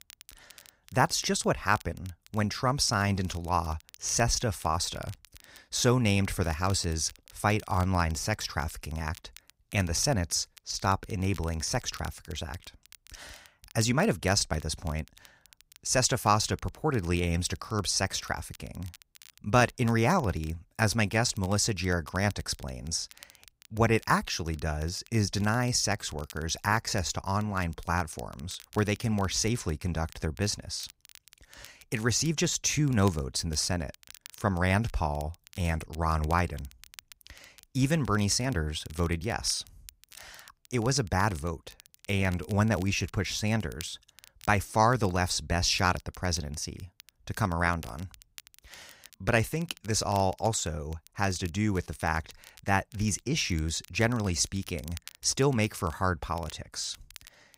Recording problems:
crackle, like an old record; faint; 25 dB below the speech

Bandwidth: 15.5 kHz